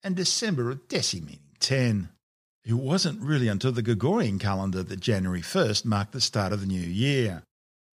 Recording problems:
none

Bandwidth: 14.5 kHz